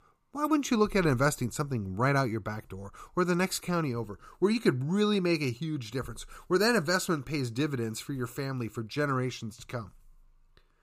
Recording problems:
none

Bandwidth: 15 kHz